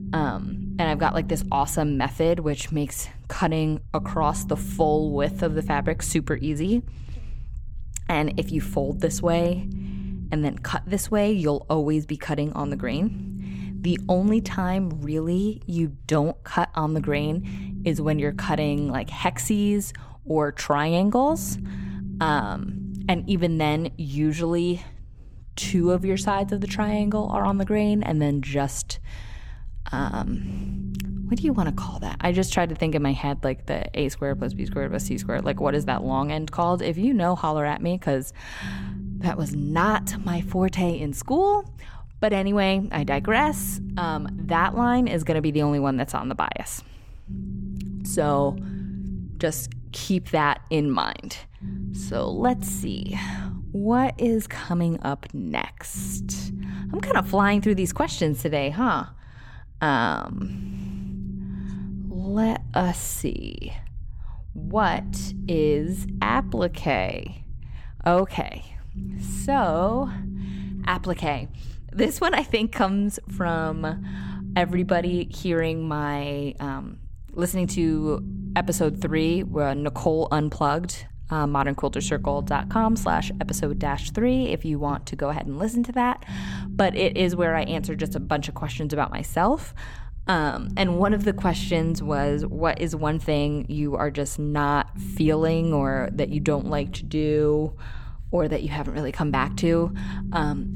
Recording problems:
low rumble; noticeable; throughout; 15 dB below the speech

